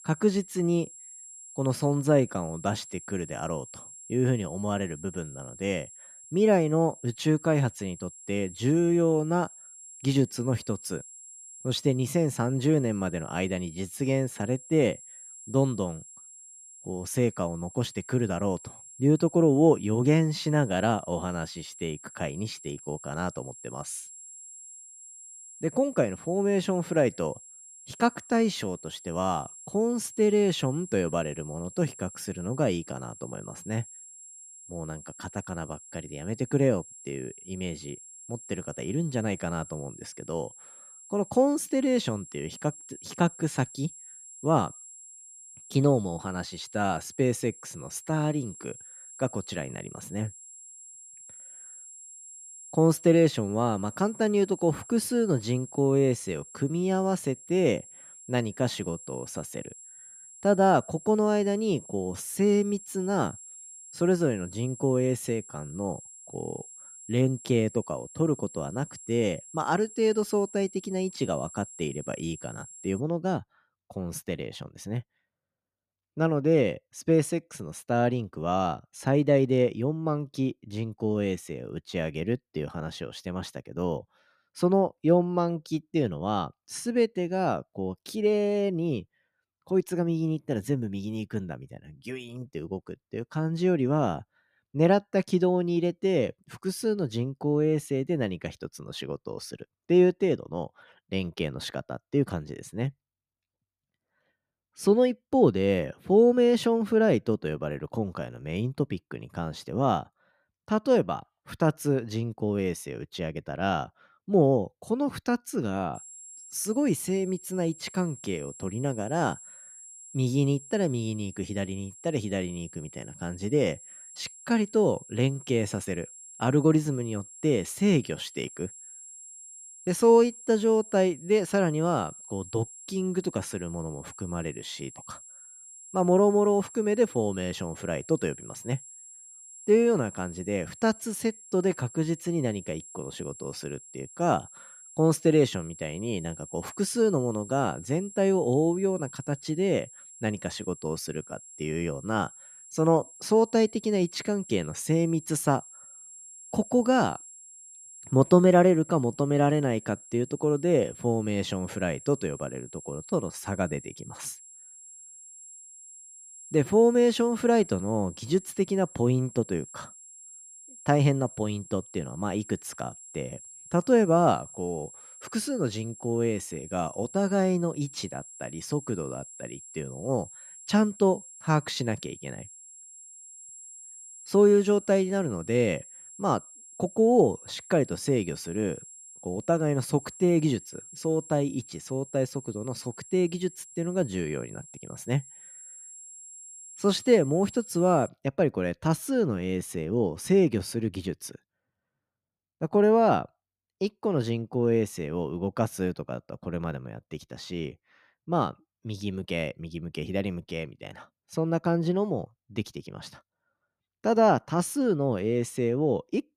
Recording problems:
high-pitched whine; noticeable; until 1:13 and from 1:56 to 3:18; 7.5 kHz, 15 dB below the speech

